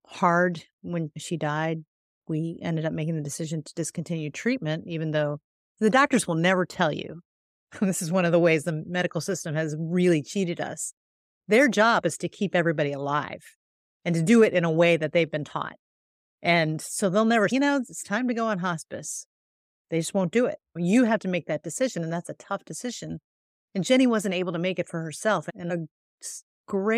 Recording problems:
abrupt cut into speech; at the end

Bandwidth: 15.5 kHz